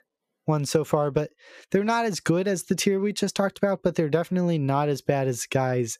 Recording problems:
squashed, flat; heavily

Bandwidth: 14.5 kHz